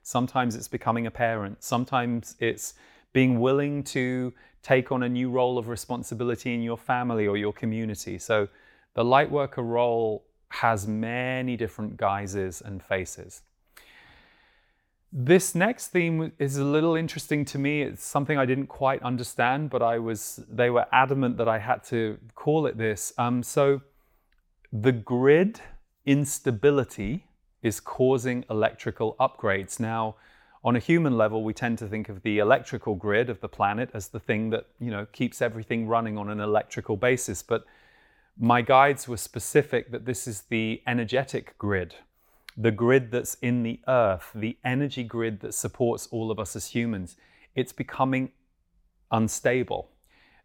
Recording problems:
none

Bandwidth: 17 kHz